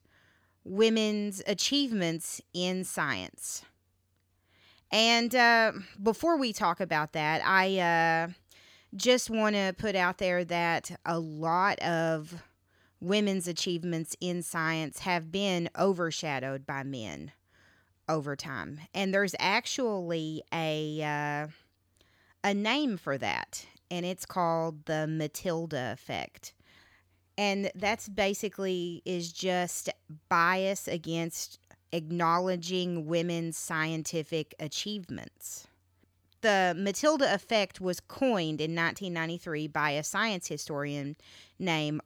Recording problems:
none

